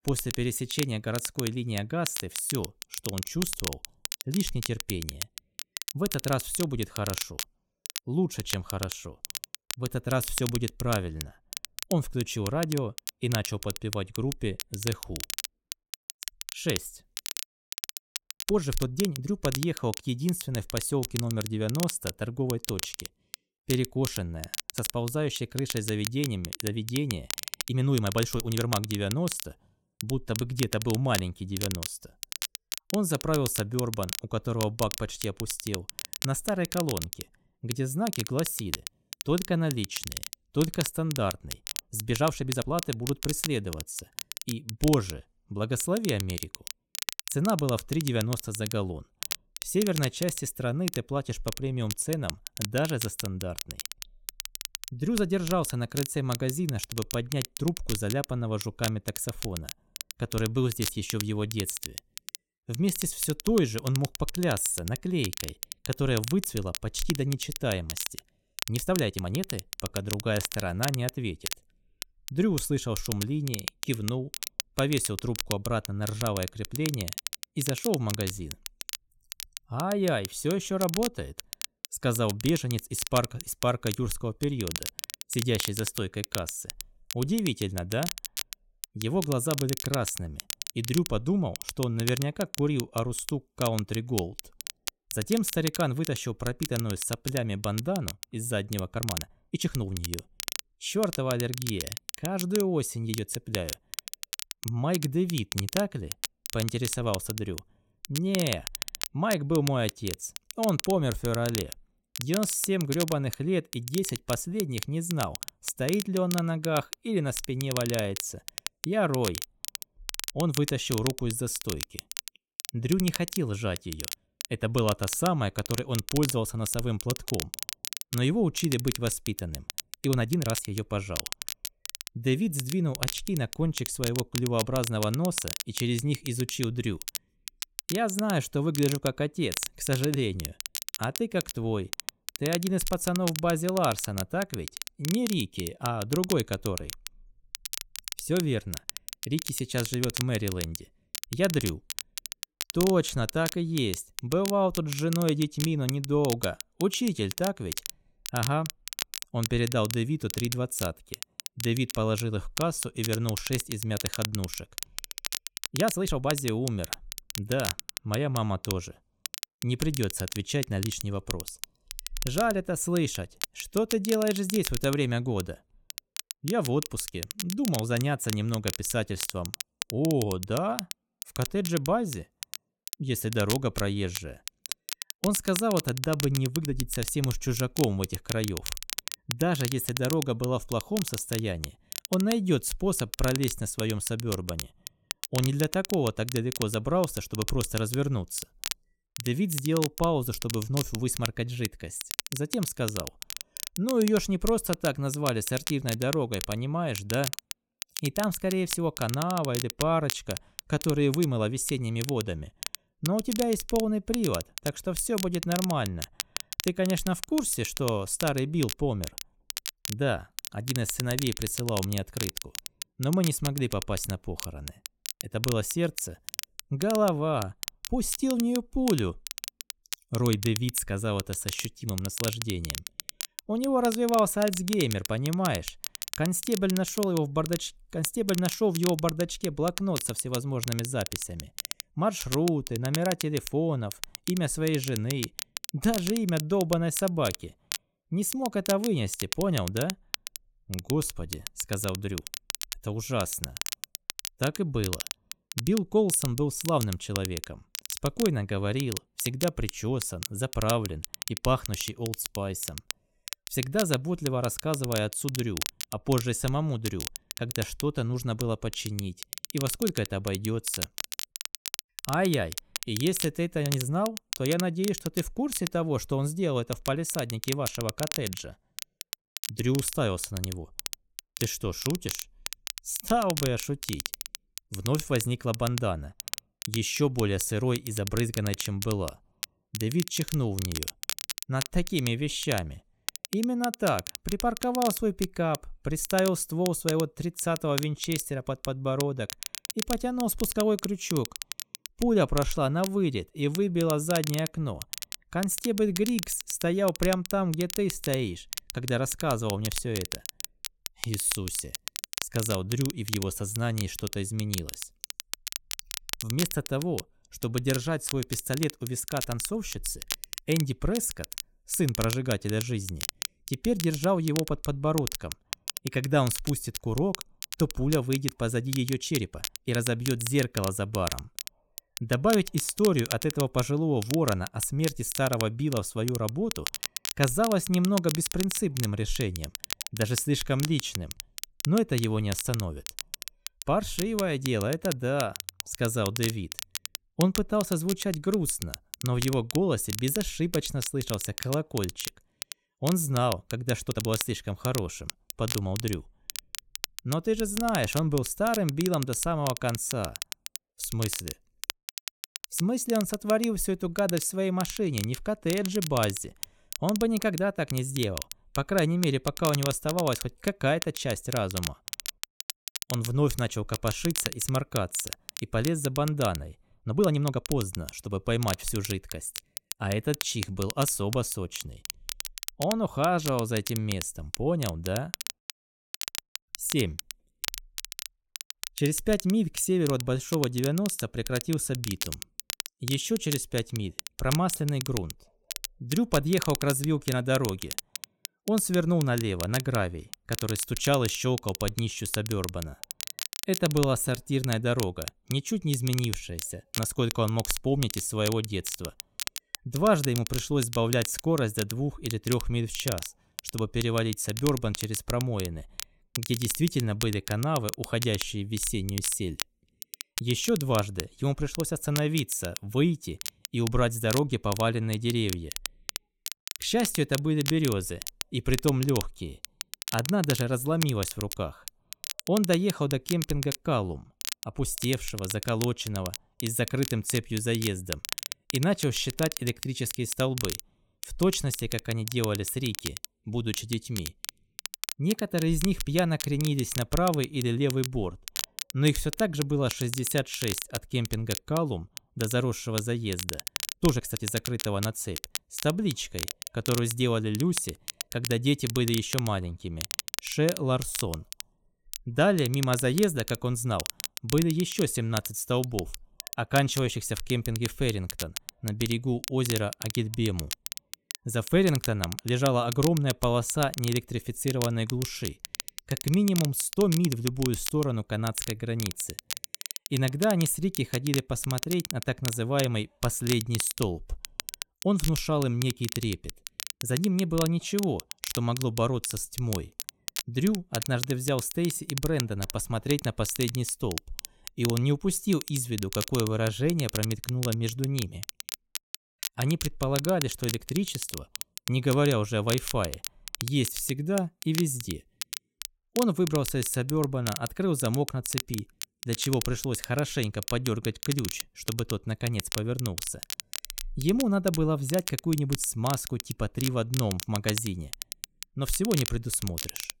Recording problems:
crackle, like an old record; loud; 7 dB below the speech
uneven, jittery; strongly; from 18 s to 8:07

